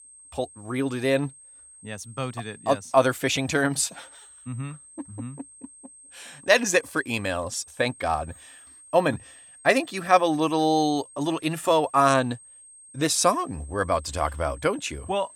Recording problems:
high-pitched whine; faint; throughout; 8.5 kHz, 20 dB below the speech

